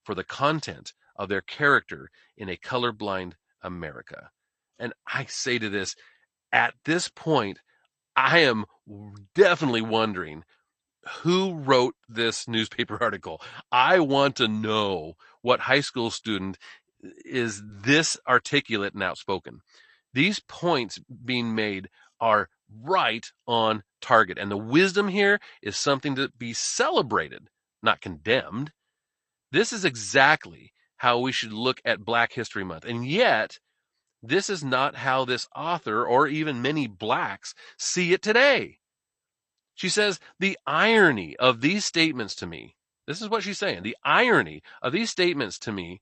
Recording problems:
garbled, watery; slightly; nothing above 8.5 kHz

